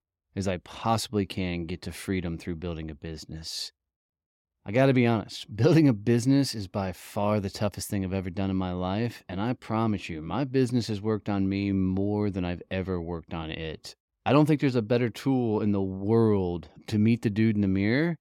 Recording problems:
none

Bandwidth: 16.5 kHz